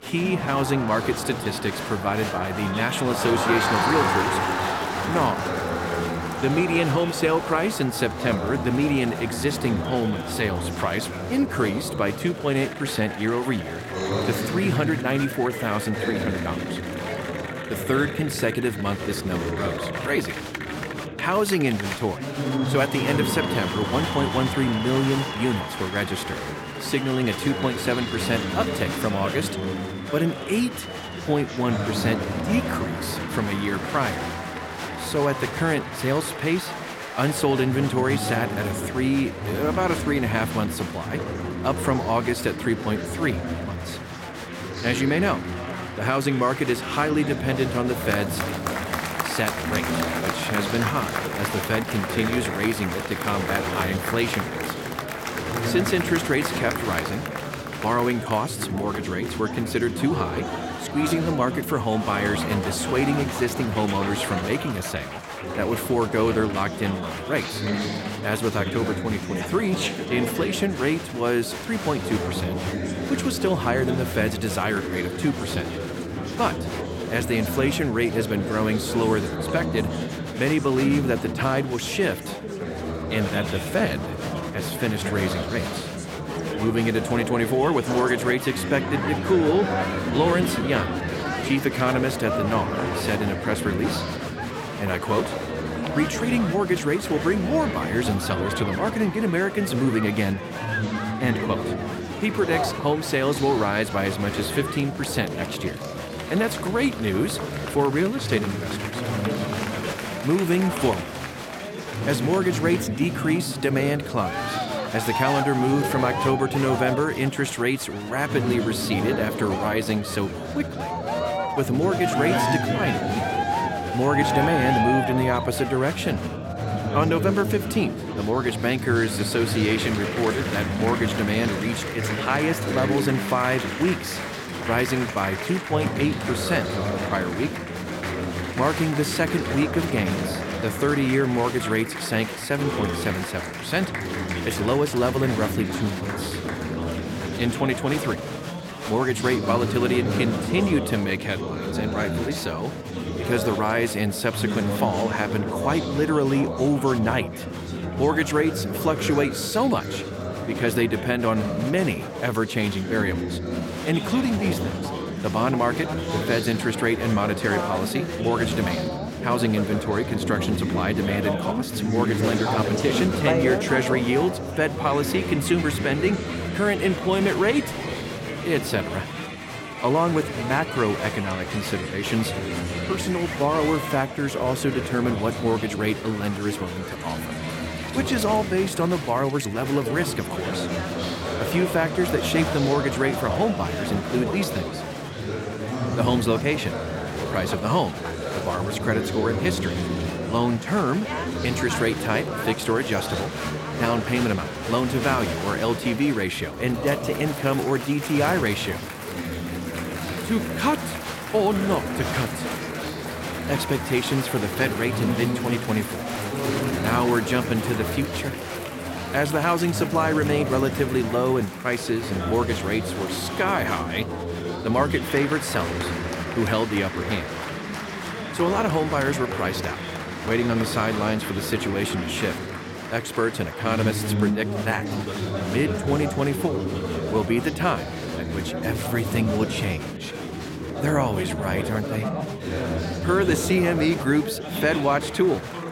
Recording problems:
chatter from many people; loud; throughout; 4 dB below the speech

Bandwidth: 16.5 kHz